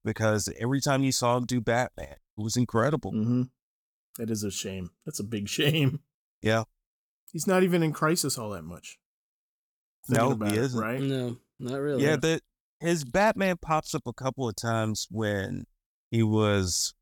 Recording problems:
none

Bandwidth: 18 kHz